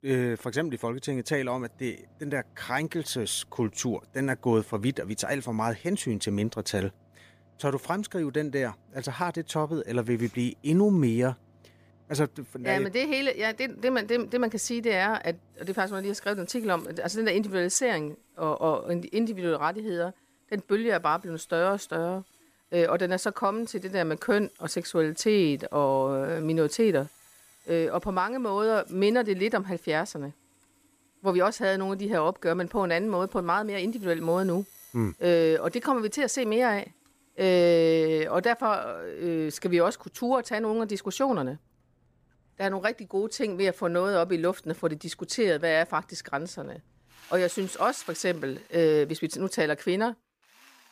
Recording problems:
machinery noise; faint; throughout; 30 dB below the speech

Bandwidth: 15 kHz